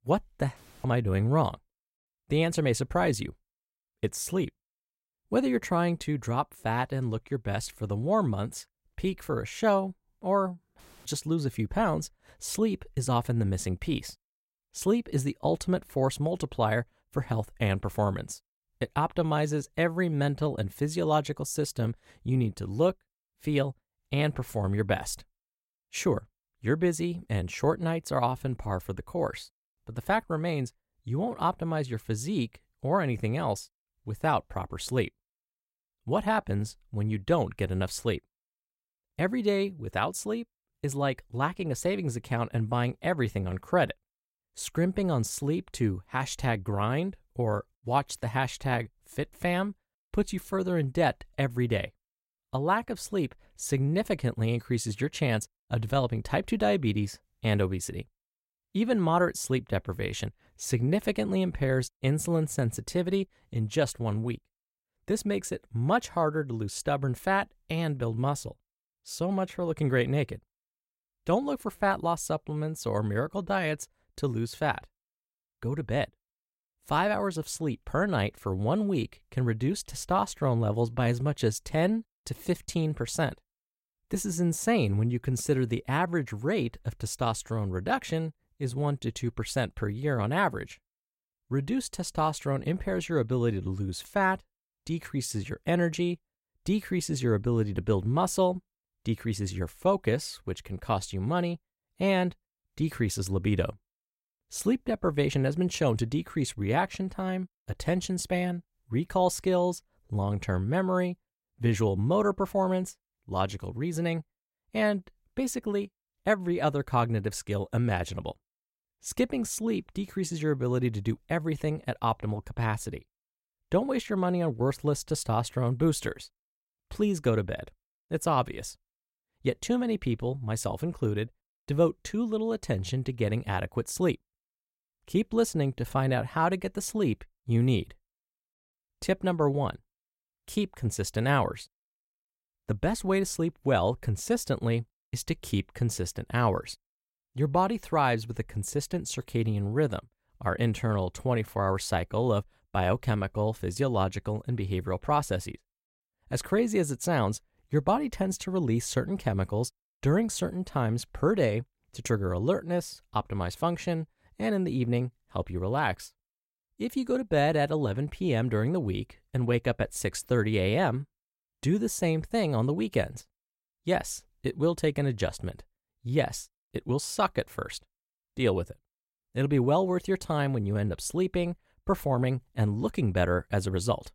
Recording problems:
none

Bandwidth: 16 kHz